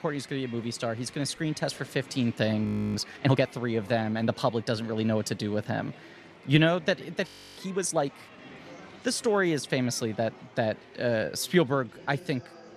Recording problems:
murmuring crowd; faint; throughout; 20 dB below the speech
audio freezing; at 2.5 s and at 7.5 s

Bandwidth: 13.5 kHz